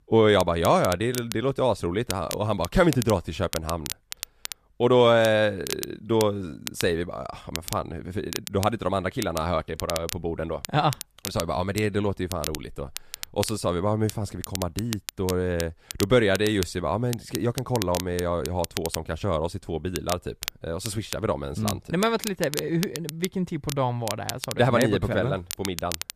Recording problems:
crackle, like an old record; noticeable; 10 dB below the speech

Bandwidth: 14.5 kHz